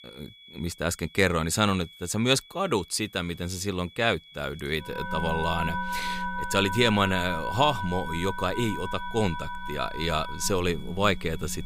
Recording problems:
background music; loud; from 5 s on; 7 dB below the speech
high-pitched whine; faint; throughout; 3.5 kHz, 20 dB below the speech

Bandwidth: 15.5 kHz